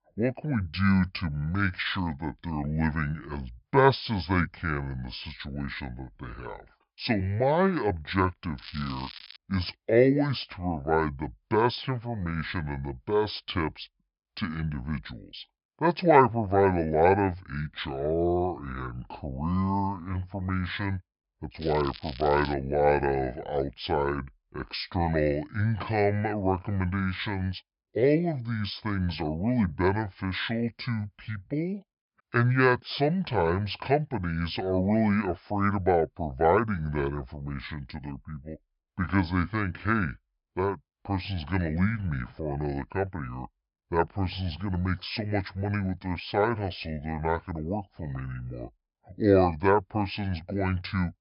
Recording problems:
wrong speed and pitch; too slow and too low; 0.7 times normal speed
high frequencies cut off; noticeable; nothing above 5.5 kHz
crackling; noticeable; at 8.5 s and at 22 s; 15 dB below the speech

